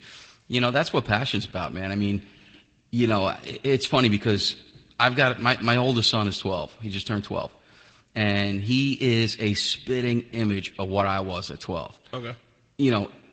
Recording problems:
echo of what is said; faint; throughout; 100 ms later, 25 dB below the speech
garbled, watery; slightly; nothing above 8 kHz

